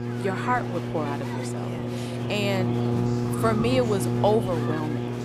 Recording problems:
electrical hum; loud; throughout; 60 Hz, 7 dB below the speech
murmuring crowd; loud; throughout; 10 dB below the speech
rain or running water; noticeable; throughout; 10 dB below the speech

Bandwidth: 15 kHz